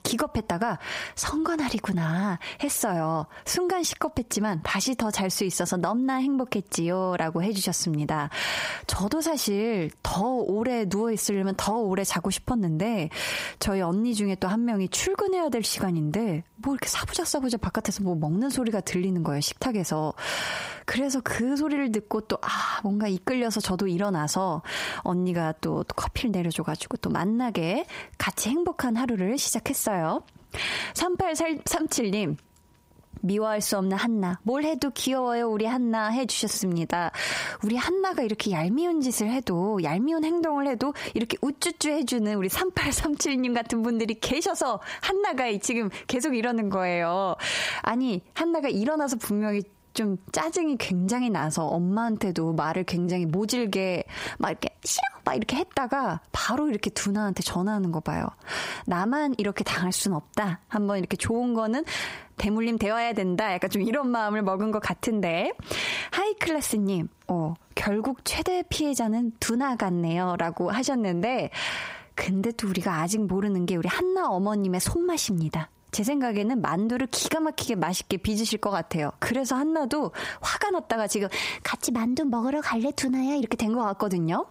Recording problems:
squashed, flat; heavily

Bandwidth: 15.5 kHz